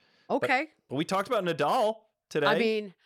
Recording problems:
none

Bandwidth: 17.5 kHz